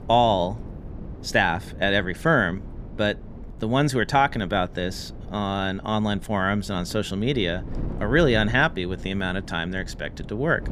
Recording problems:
wind noise on the microphone; occasional gusts; 20 dB below the speech

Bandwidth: 15 kHz